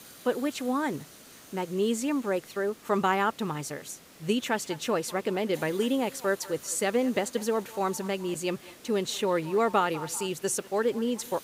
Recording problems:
echo of what is said; faint; from 4.5 s on; 200 ms later, 20 dB below the speech
hiss; faint; throughout; 20 dB below the speech

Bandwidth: 15.5 kHz